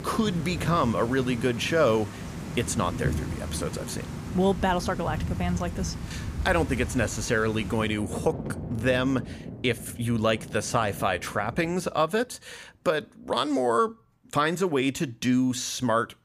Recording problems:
rain or running water; loud; until 12 s; 9 dB below the speech

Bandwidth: 15 kHz